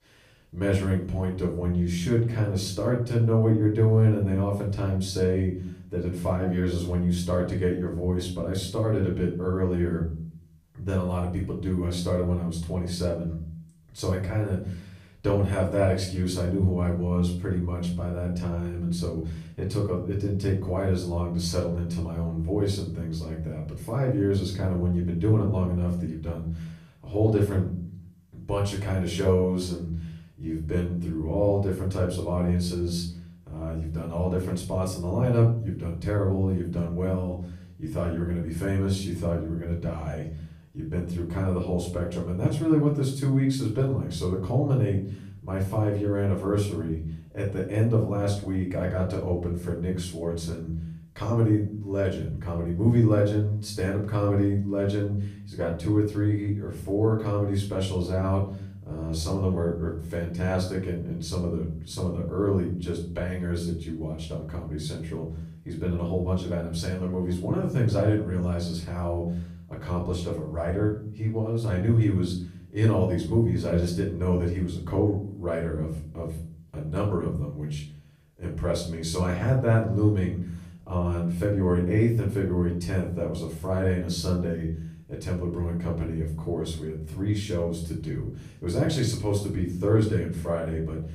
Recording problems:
off-mic speech; far
room echo; slight; dies away in 0.5 s

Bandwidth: 15 kHz